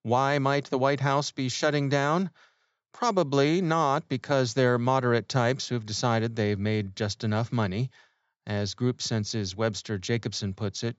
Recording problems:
high frequencies cut off; noticeable; nothing above 8 kHz

